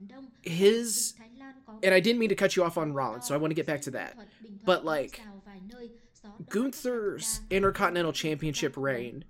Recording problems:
voice in the background; faint; throughout; 25 dB below the speech

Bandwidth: 16 kHz